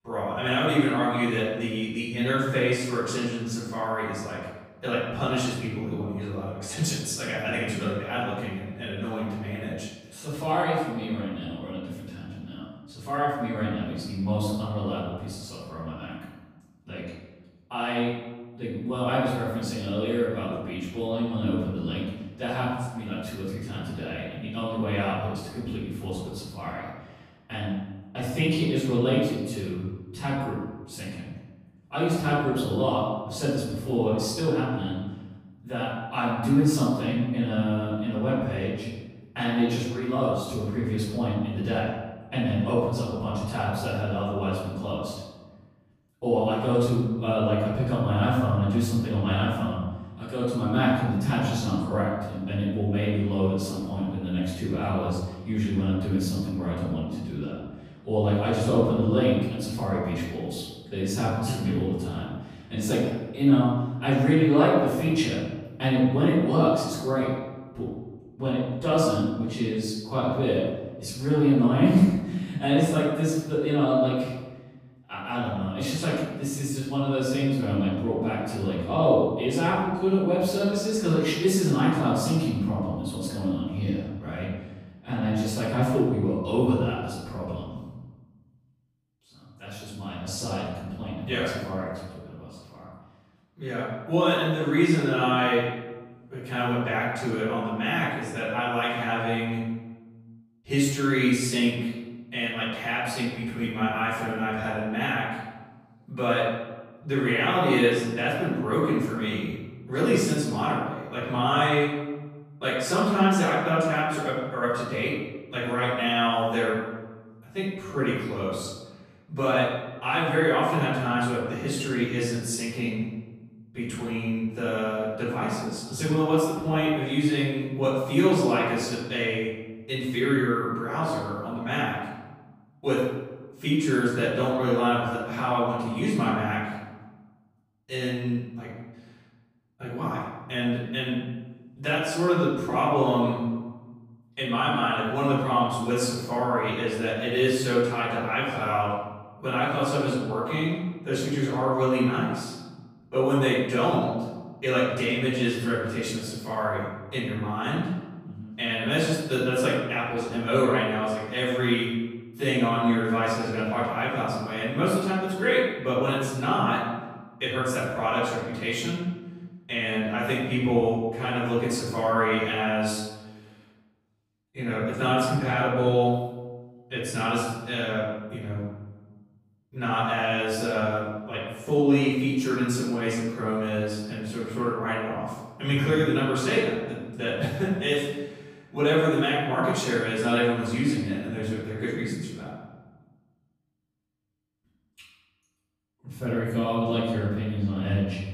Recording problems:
room echo; strong; dies away in 1 s
off-mic speech; far

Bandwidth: 15 kHz